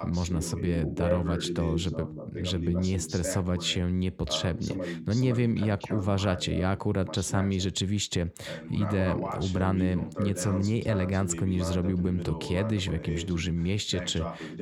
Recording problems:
voice in the background; loud; throughout; 8 dB below the speech

